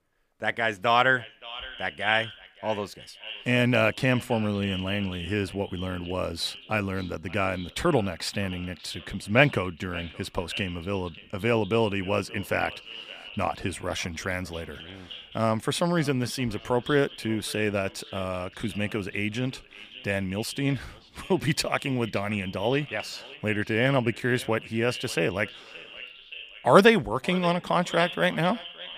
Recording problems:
echo of what is said; noticeable; throughout; 570 ms later, 15 dB below the speech

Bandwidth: 15 kHz